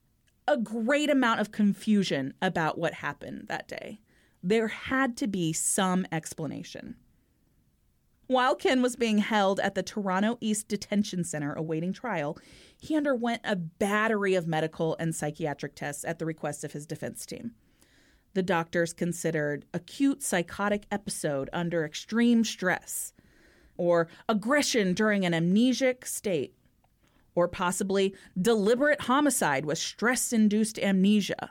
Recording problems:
none

